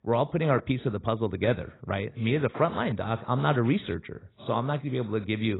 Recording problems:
garbled, watery; badly; nothing above 4 kHz
abrupt cut into speech; at the end

